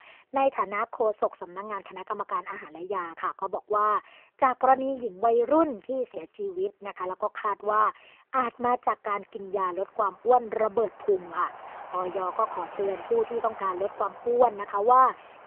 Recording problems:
phone-call audio; poor line
traffic noise; noticeable; throughout; 15 dB below the speech
choppy; very; from 5 to 7 s; 6% of the speech affected

